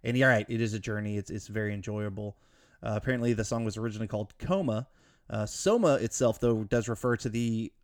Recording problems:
none

